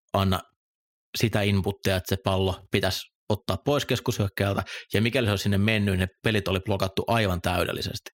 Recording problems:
none

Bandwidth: 16 kHz